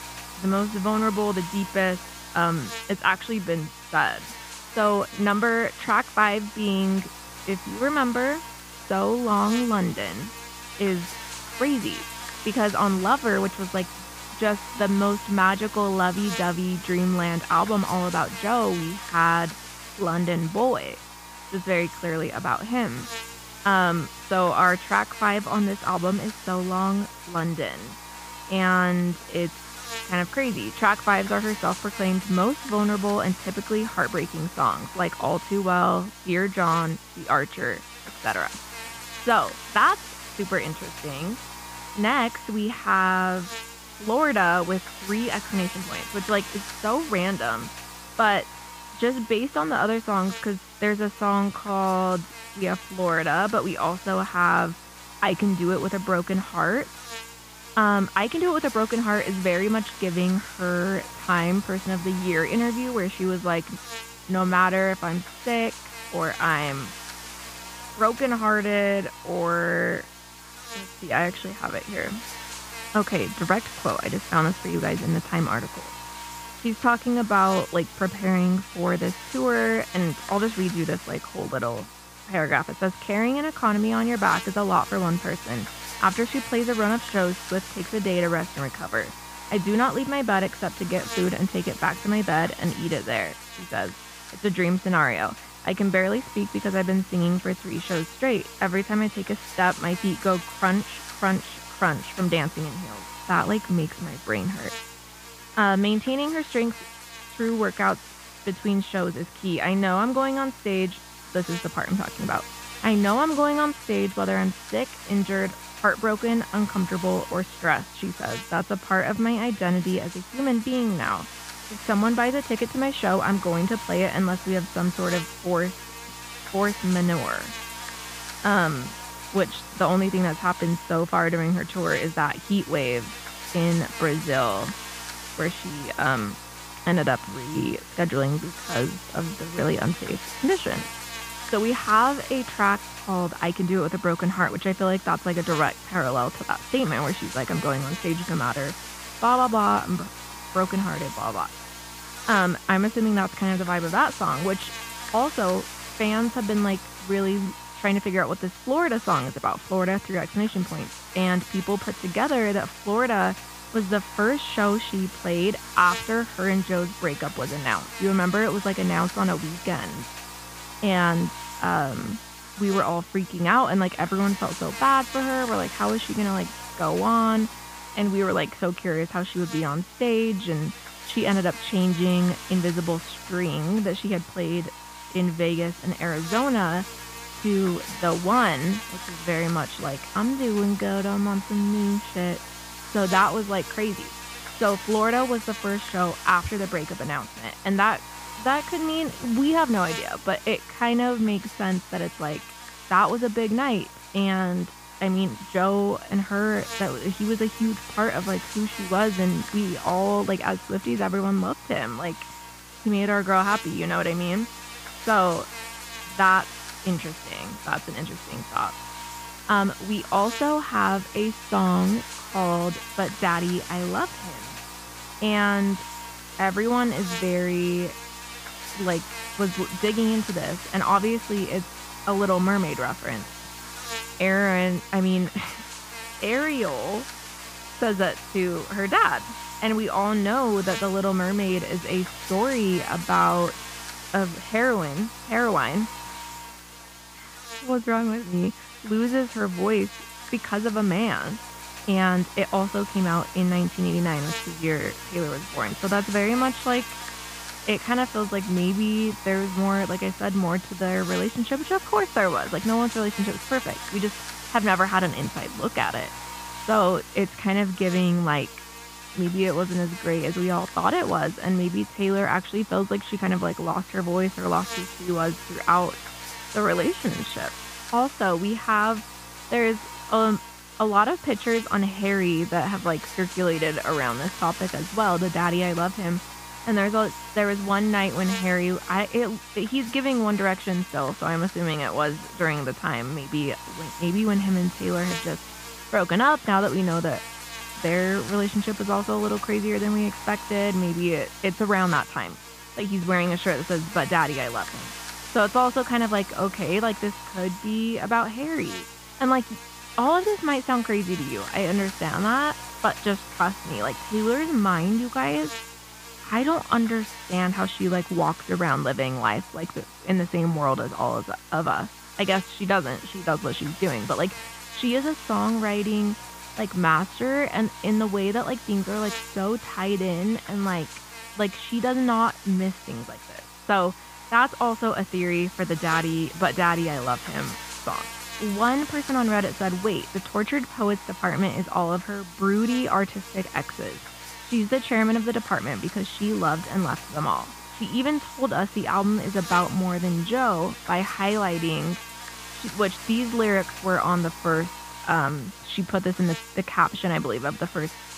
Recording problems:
muffled; very; fading above 3.5 kHz
electrical hum; noticeable; throughout; 60 Hz, 10 dB below the speech

